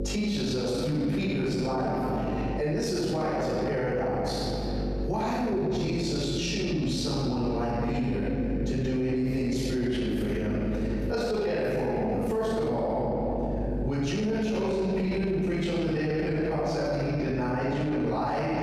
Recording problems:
room echo; strong; dies away in 2.1 s
off-mic speech; far
squashed, flat; somewhat
electrical hum; noticeable; throughout; 50 Hz, 15 dB below the speech

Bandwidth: 14.5 kHz